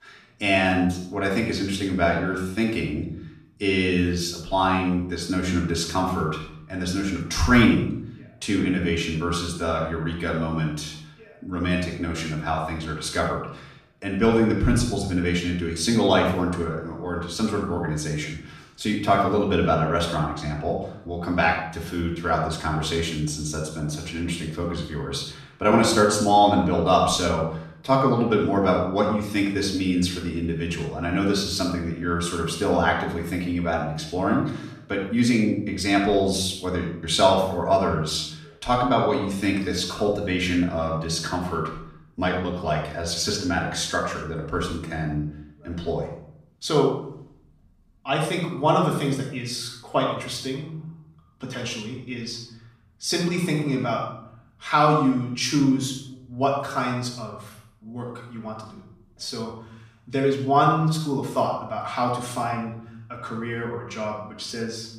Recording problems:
off-mic speech; far
room echo; noticeable; dies away in 0.6 s

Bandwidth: 14.5 kHz